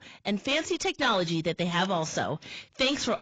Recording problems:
garbled, watery; badly; nothing above 7.5 kHz
distortion; slight; 10 dB below the speech

